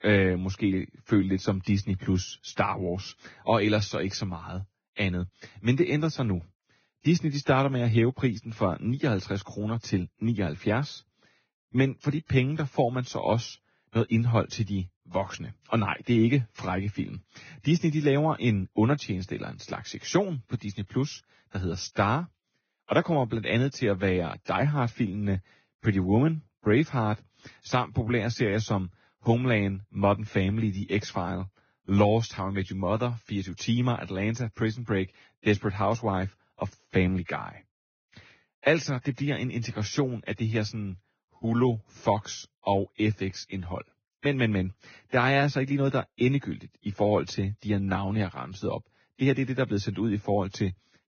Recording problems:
garbled, watery; badly; nothing above 6.5 kHz

